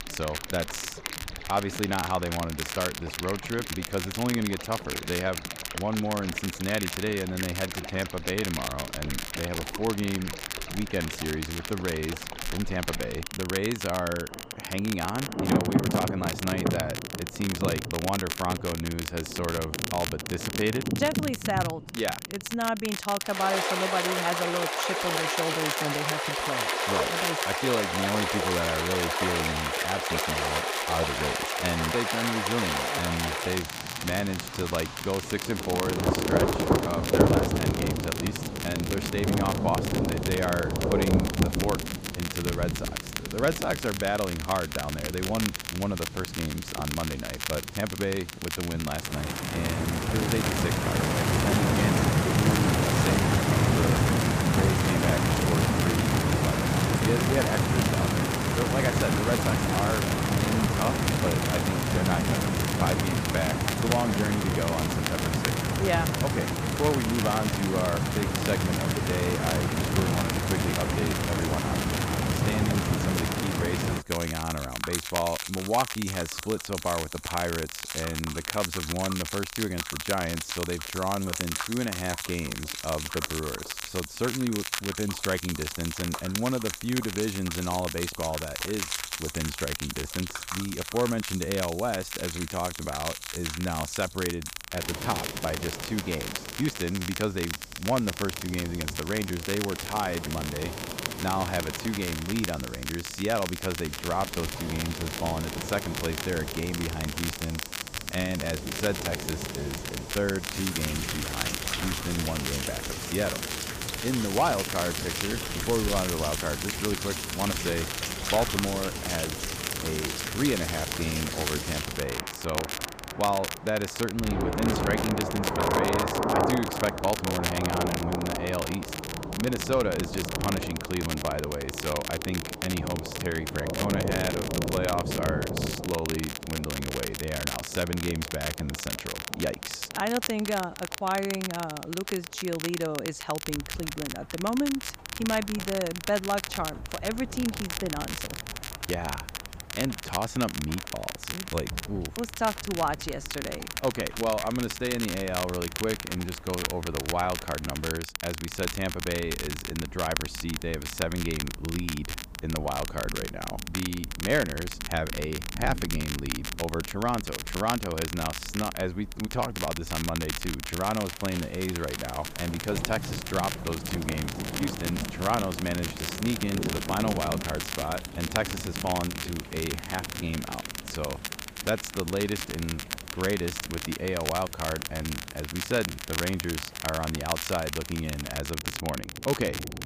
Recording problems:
rain or running water; very loud; throughout; 1 dB above the speech
crackle, like an old record; loud; 4 dB below the speech

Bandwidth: 15 kHz